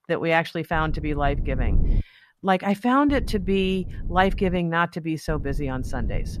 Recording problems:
low rumble; faint; from 0.5 to 2 s, from 3 to 4.5 s and from 5.5 s on; 20 dB below the speech

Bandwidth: 14.5 kHz